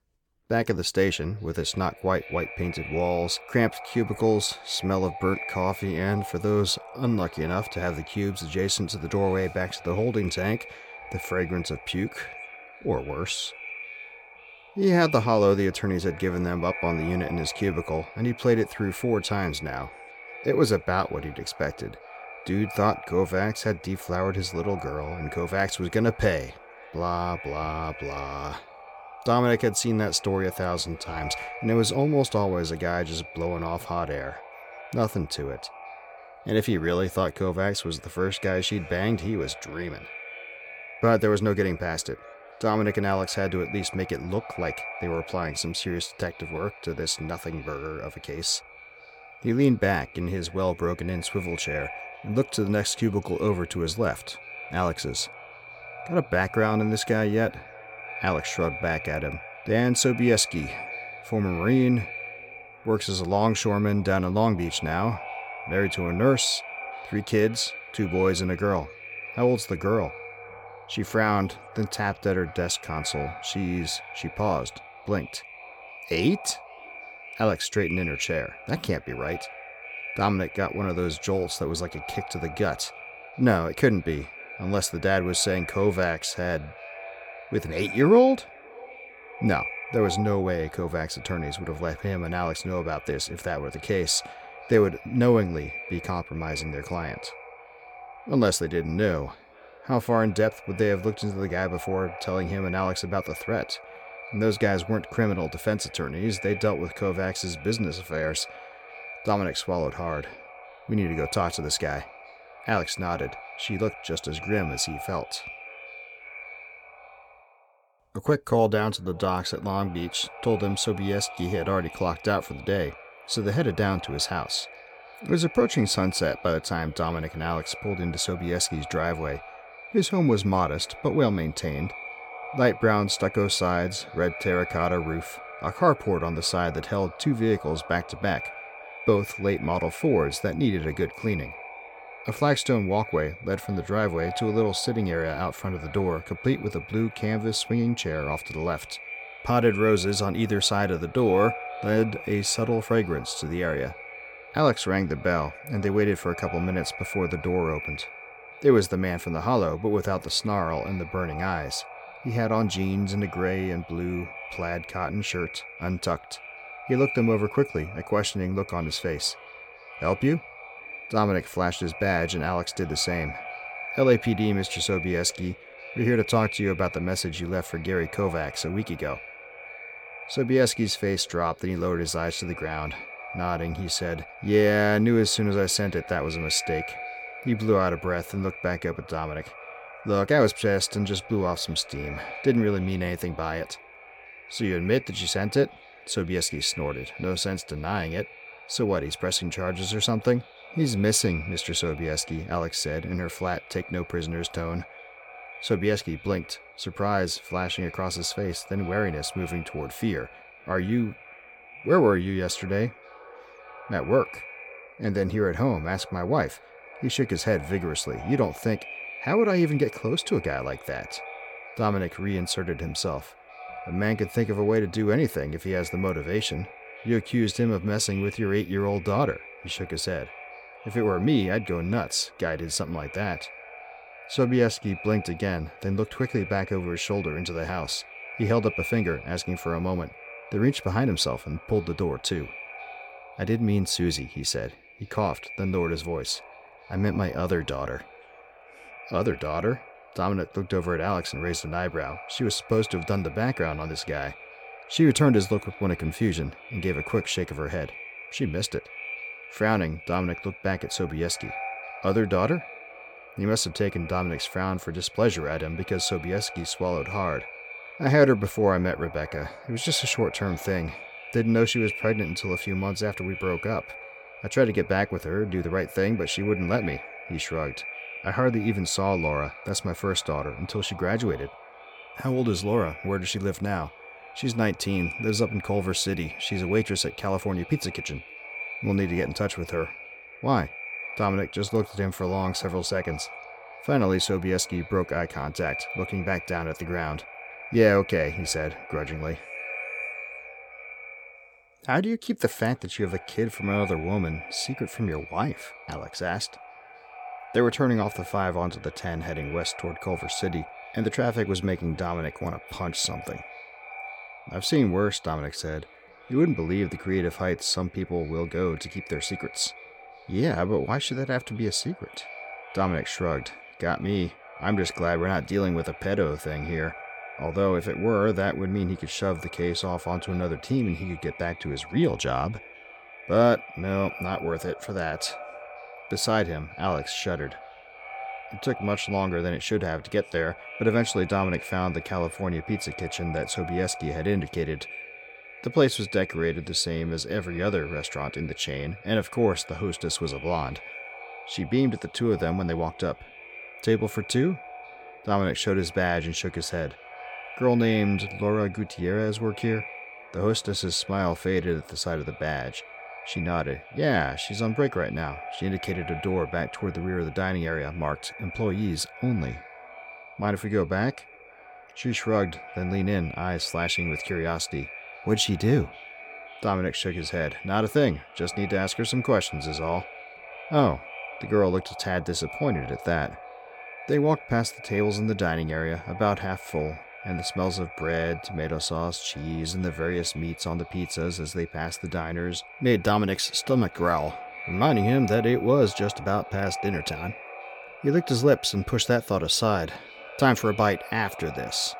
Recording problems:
echo of what is said; noticeable; throughout; 530 ms later, 15 dB below the speech

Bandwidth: 17 kHz